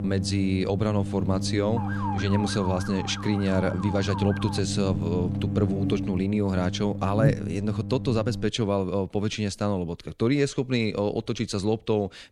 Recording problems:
electrical hum; loud; until 8.5 s; 50 Hz, 10 dB below the speech
siren; noticeable; from 2 to 4.5 s; peak 7 dB below the speech

